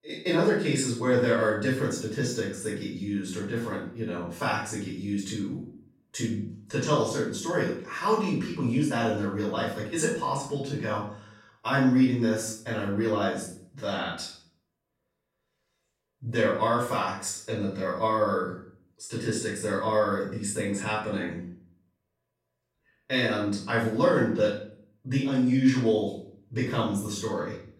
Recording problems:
off-mic speech; far
room echo; noticeable; dies away in 0.5 s

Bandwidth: 16.5 kHz